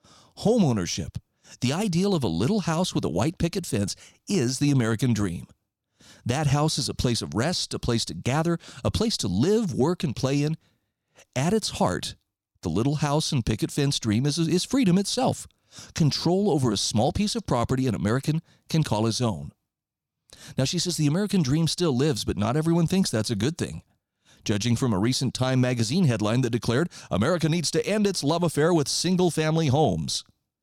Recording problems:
none

